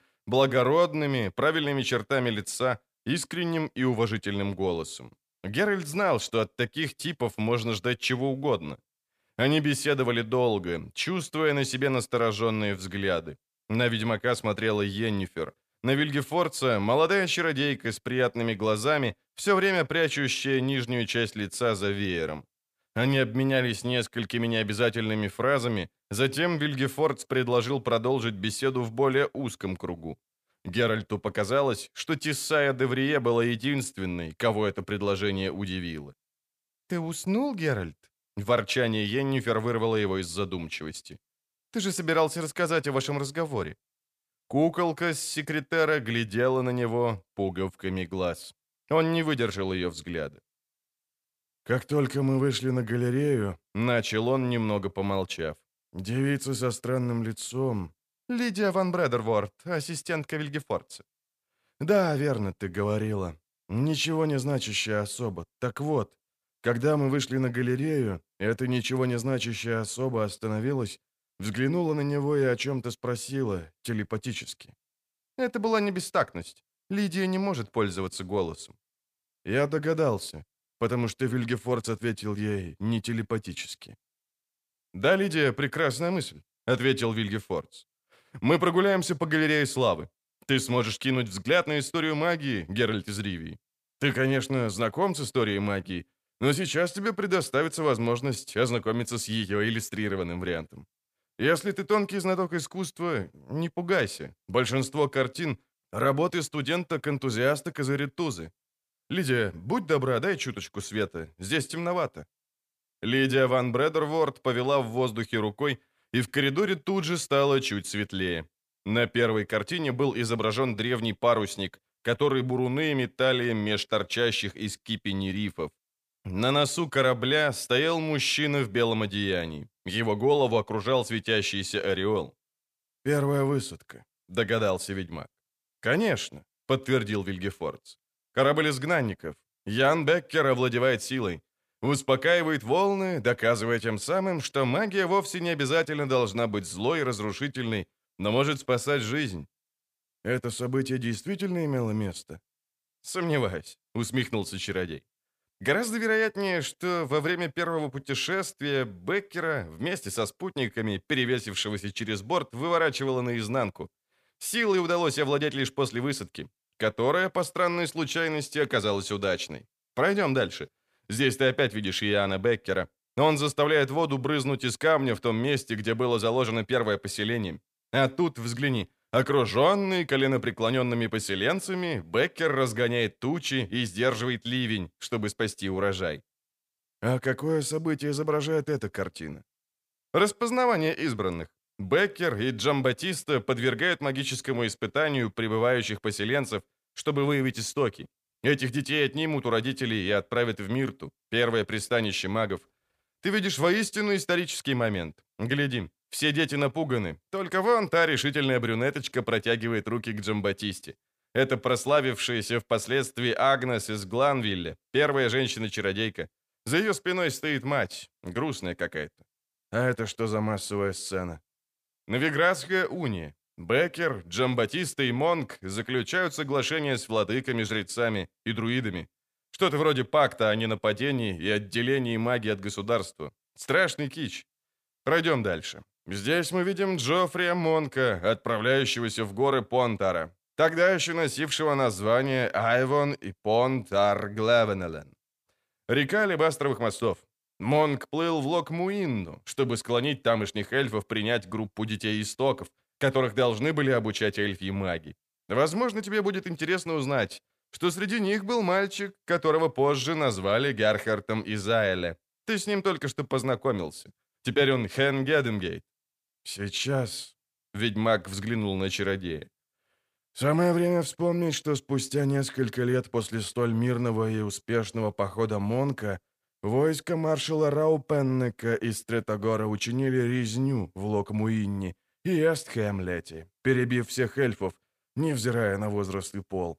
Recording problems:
none

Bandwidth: 15 kHz